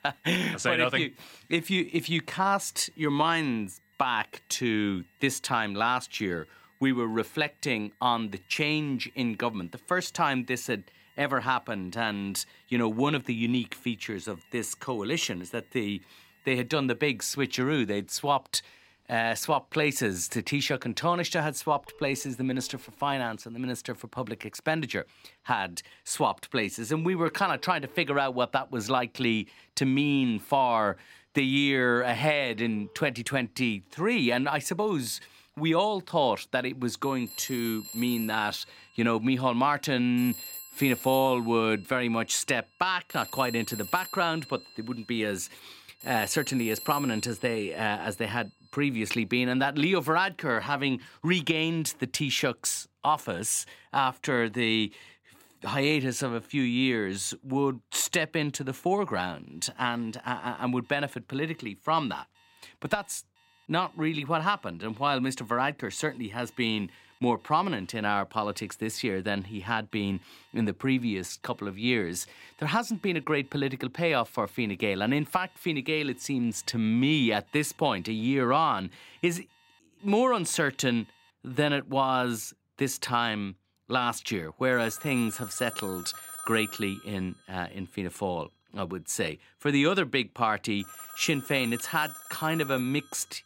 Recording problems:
alarms or sirens; noticeable; throughout; 15 dB below the speech

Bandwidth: 16 kHz